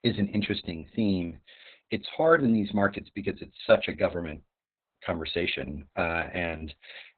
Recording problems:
garbled, watery; badly; nothing above 4 kHz

